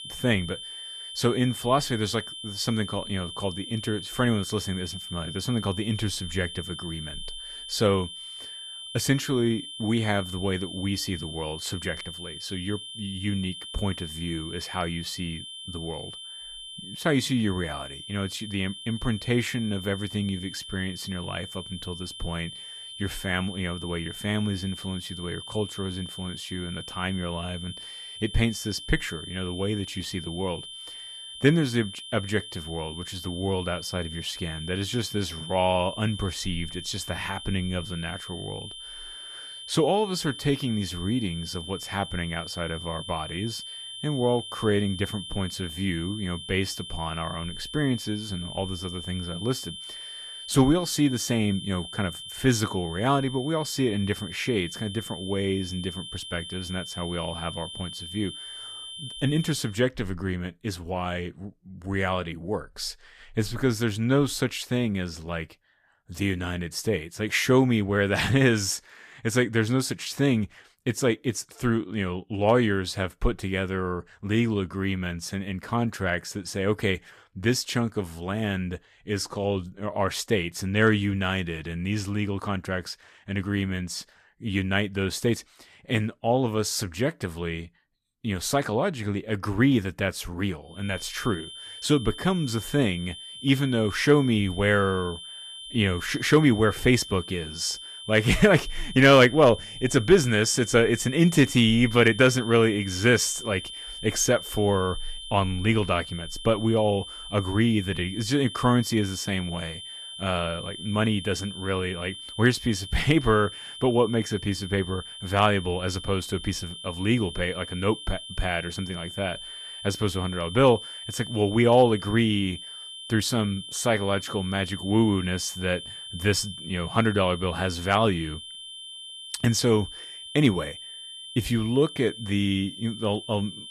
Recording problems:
high-pitched whine; noticeable; until 1:00 and from 1:31 on; 3 kHz, 10 dB below the speech

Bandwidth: 14.5 kHz